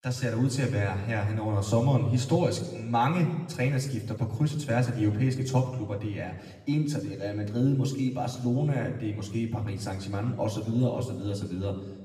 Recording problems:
room echo; slight; dies away in 1 s
off-mic speech; somewhat distant

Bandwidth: 14.5 kHz